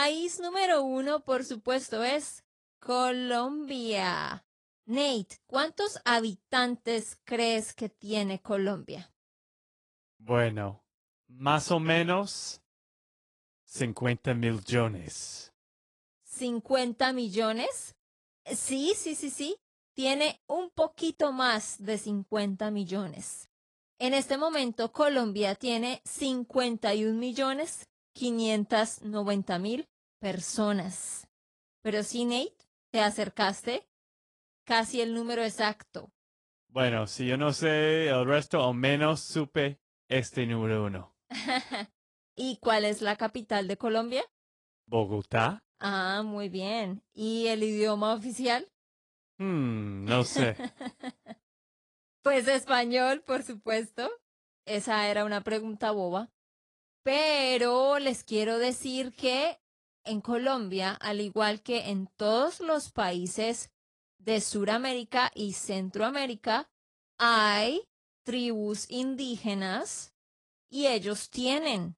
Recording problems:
garbled, watery; slightly; nothing above 10.5 kHz
abrupt cut into speech; at the start

